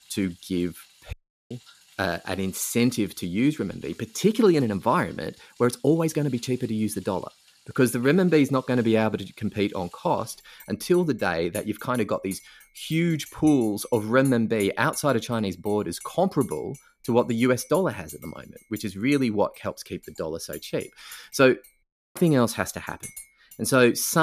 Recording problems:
household noises; faint; throughout; 25 dB below the speech
audio cutting out; at 1 s and at 22 s
abrupt cut into speech; at the end

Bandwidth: 14.5 kHz